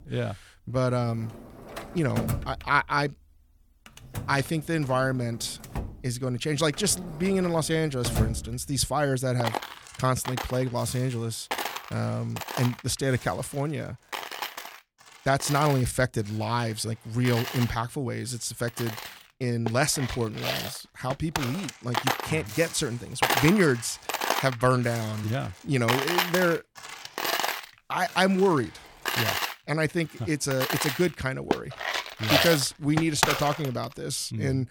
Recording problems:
household noises; loud; throughout; 4 dB below the speech

